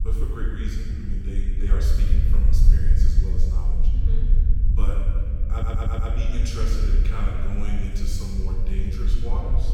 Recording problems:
room echo; strong; dies away in 2.8 s
off-mic speech; far
low rumble; loud; throughout; 7 dB below the speech
audio stuttering; at 5.5 s

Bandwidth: 18 kHz